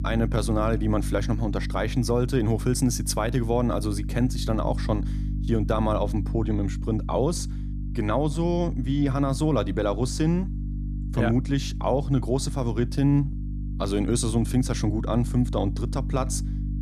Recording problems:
electrical hum; noticeable; throughout; 50 Hz, 15 dB below the speech

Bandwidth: 14.5 kHz